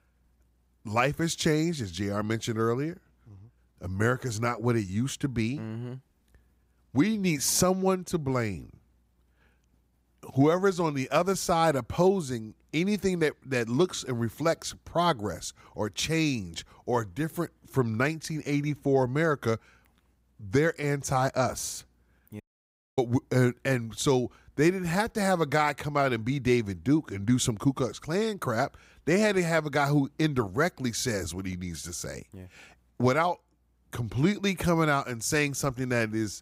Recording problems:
audio cutting out; at 22 s for 0.5 s

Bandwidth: 15.5 kHz